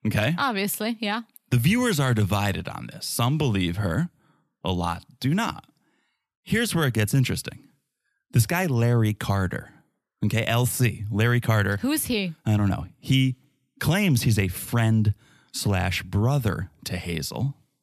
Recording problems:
none

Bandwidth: 14.5 kHz